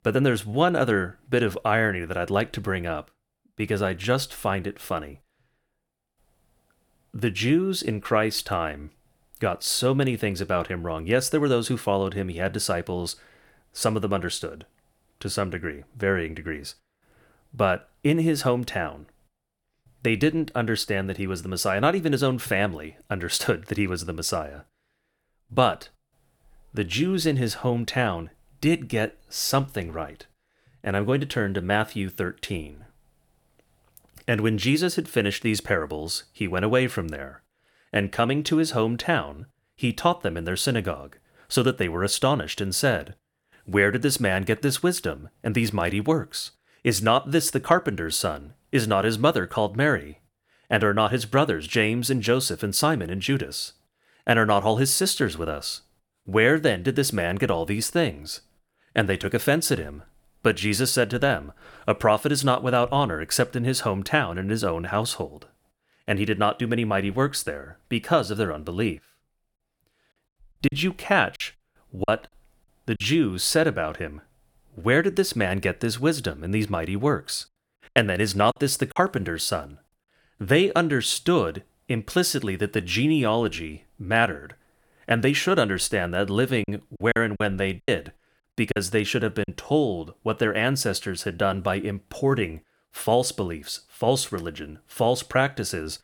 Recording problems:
choppy; very; from 1:11 to 1:13, from 1:18 to 1:19 and from 1:27 to 1:29; 10% of the speech affected

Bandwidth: 19 kHz